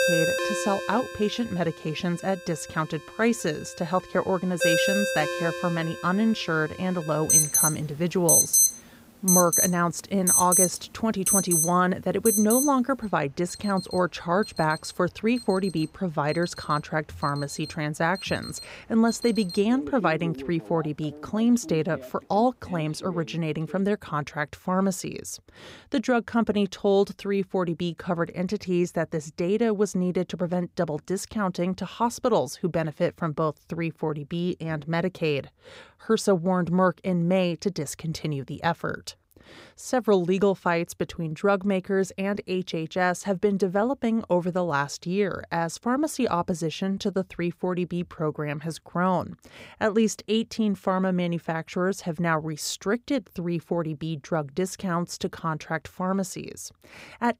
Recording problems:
alarms or sirens; very loud; until 24 s; 4 dB above the speech

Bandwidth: 15.5 kHz